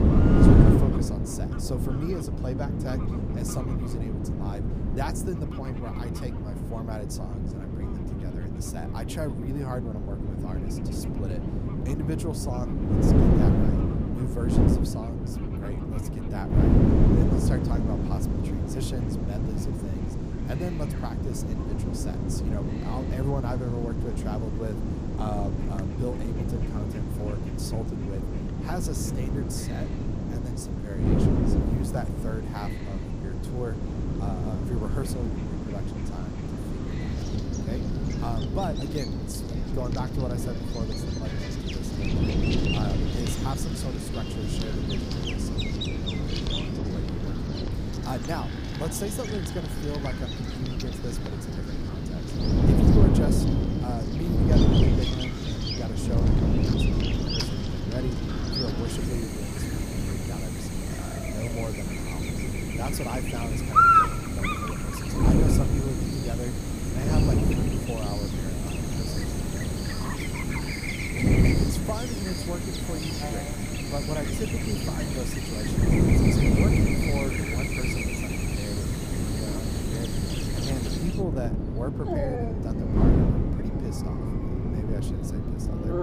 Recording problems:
animal sounds; very loud; throughout; 3 dB above the speech
wind noise on the microphone; heavy; 3 dB above the speech

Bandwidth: 15 kHz